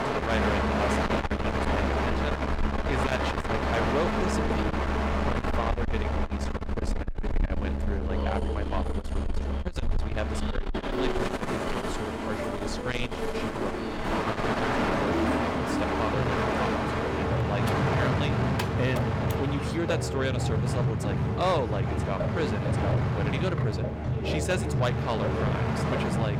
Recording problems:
distortion; heavy; 8 dB below the speech
background music; very loud; throughout; 1 dB above the speech
train or aircraft noise; very loud; throughout; 3 dB above the speech
keyboard typing; noticeable; from 18 to 19 s; peak 4 dB below the speech

